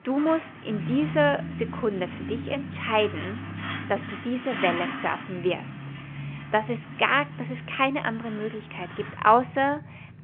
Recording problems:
phone-call audio; nothing above 3 kHz
traffic noise; loud; throughout; 9 dB below the speech
choppy; occasionally; at 2 s; 1% of the speech affected

